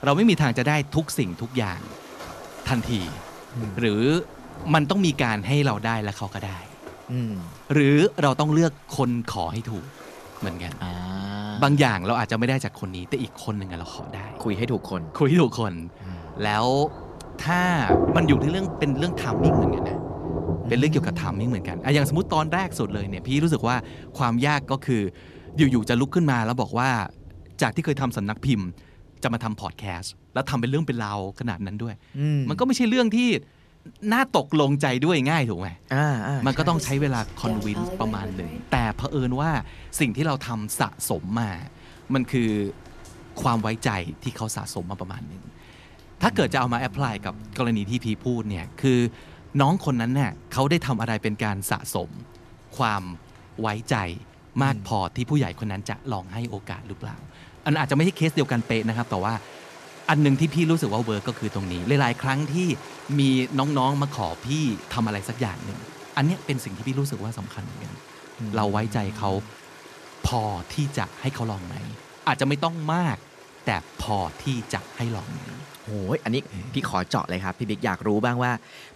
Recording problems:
rain or running water; noticeable; throughout; 10 dB below the speech

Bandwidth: 13.5 kHz